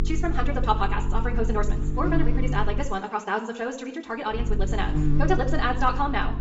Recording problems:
wrong speed, natural pitch; too fast; 1.8 times normal speed
high frequencies cut off; noticeable; nothing above 8 kHz
room echo; slight; dies away in 0.7 s
off-mic speech; somewhat distant
electrical hum; noticeable; until 3 s and from 4.5 s on; 50 Hz, 10 dB below the speech

